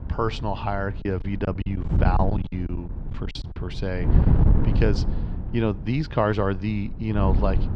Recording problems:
muffled; very slightly; fading above 4.5 kHz
wind noise on the microphone; heavy; 9 dB below the speech
choppy; very; from 1 to 3.5 s; 17% of the speech affected

